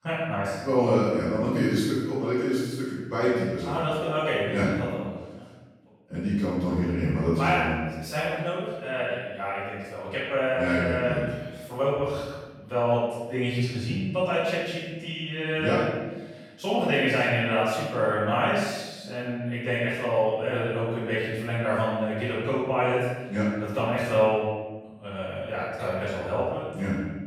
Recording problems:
room echo; strong; dies away in 1.2 s
off-mic speech; far

